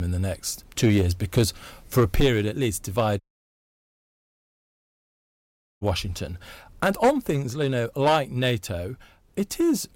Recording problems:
distortion; slight; 4% of the sound clipped
abrupt cut into speech; at the start
audio cutting out; at 3 s for 2.5 s

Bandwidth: 16 kHz